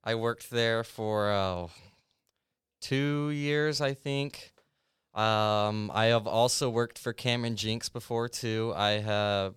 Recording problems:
none

